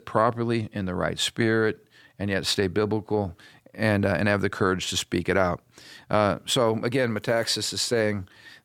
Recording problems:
none

